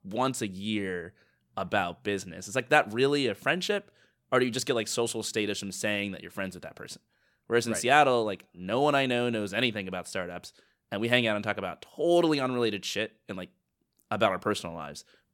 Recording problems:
none

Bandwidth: 17 kHz